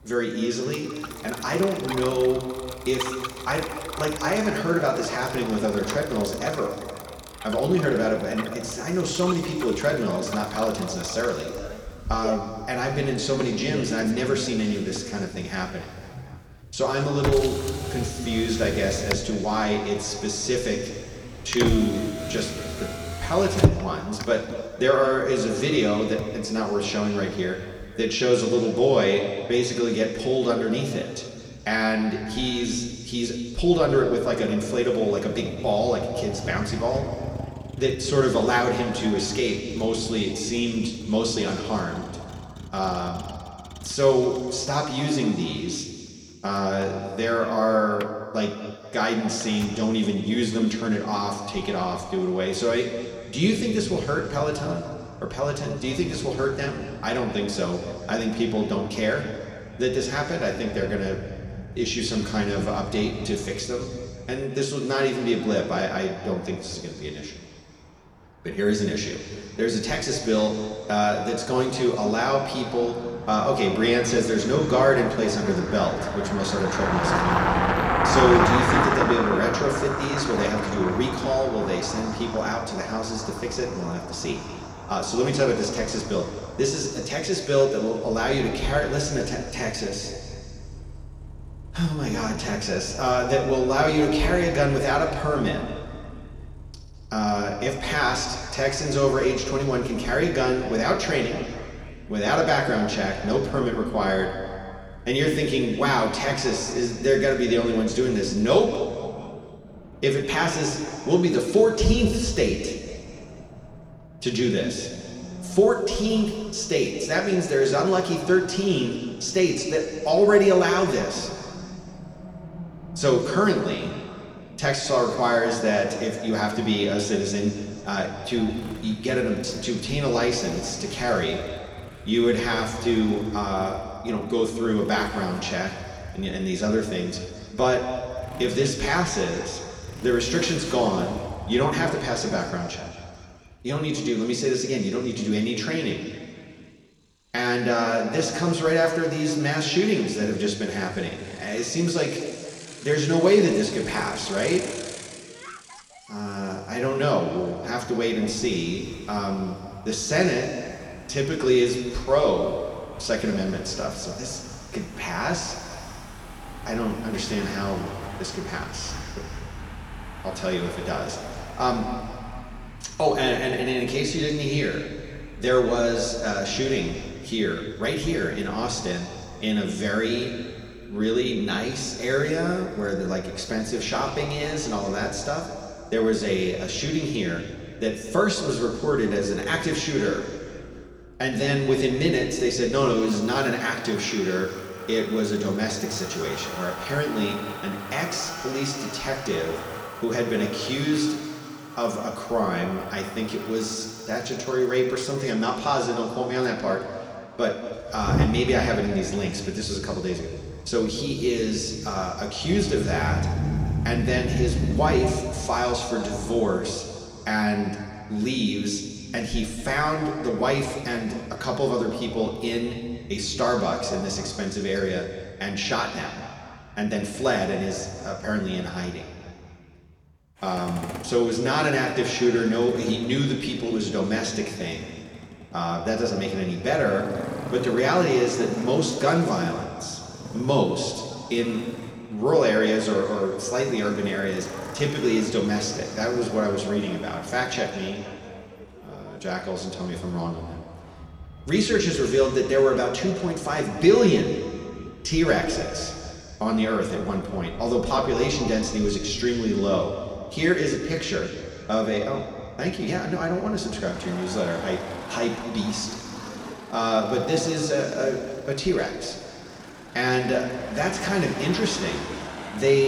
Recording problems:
room echo; noticeable; dies away in 2.3 s
off-mic speech; somewhat distant
traffic noise; noticeable; throughout; 10 dB below the speech
abrupt cut into speech; at the end

